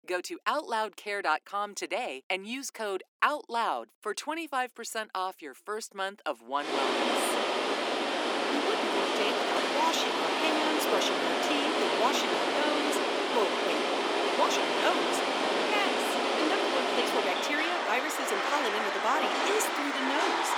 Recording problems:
thin; very slightly; fading below 300 Hz
rain or running water; very loud; from 6.5 s on; 4 dB above the speech
wind noise on the microphone; faint; from 7 to 15 s; 25 dB below the speech

